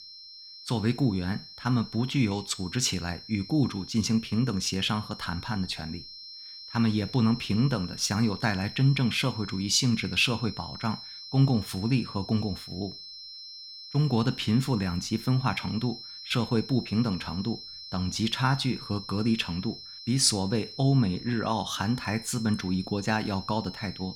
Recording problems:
high-pitched whine; noticeable; throughout; 4 kHz, 15 dB below the speech

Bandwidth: 17 kHz